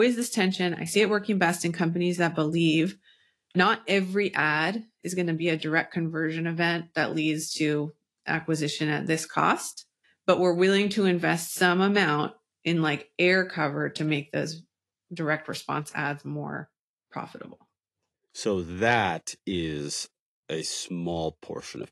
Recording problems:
garbled, watery; slightly; nothing above 12 kHz
abrupt cut into speech; at the start

